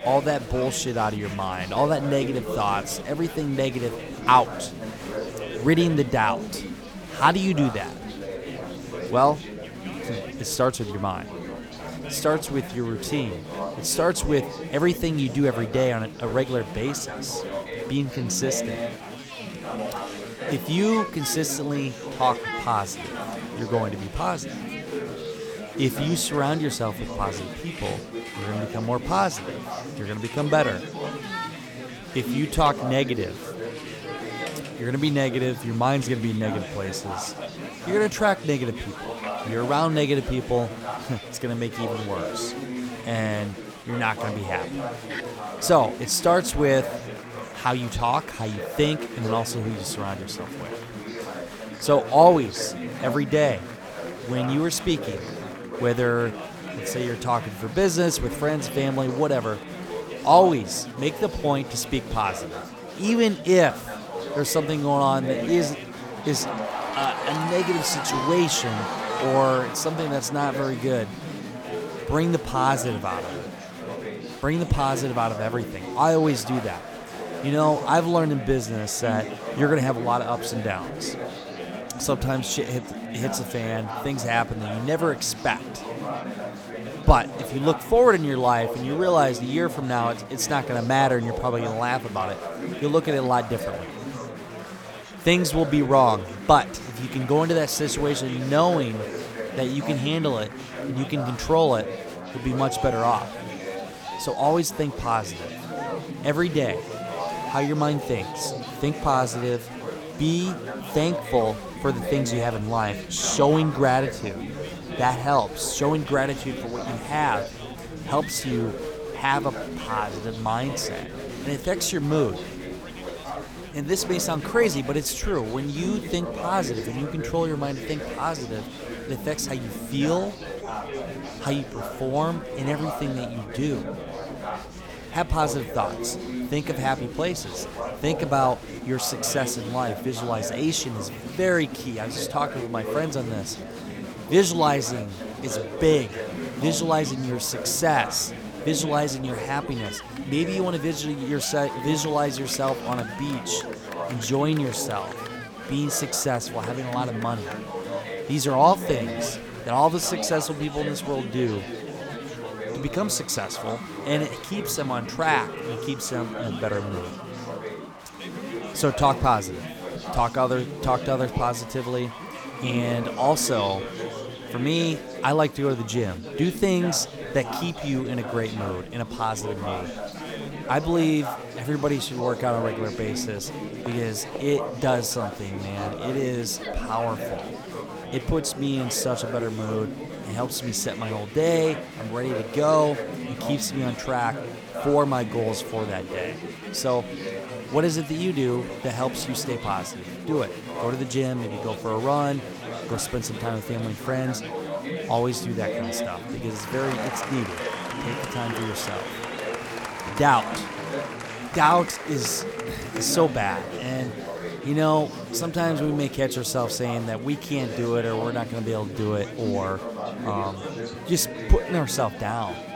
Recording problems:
chatter from many people; loud; throughout; 8 dB below the speech

